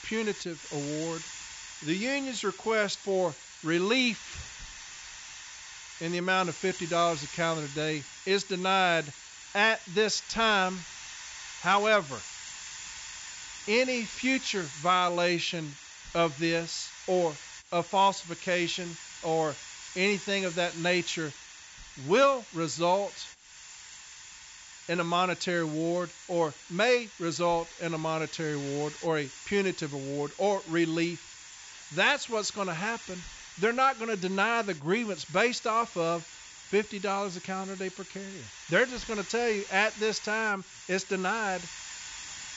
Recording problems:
high frequencies cut off; noticeable; nothing above 8 kHz
hiss; noticeable; throughout; 15 dB below the speech

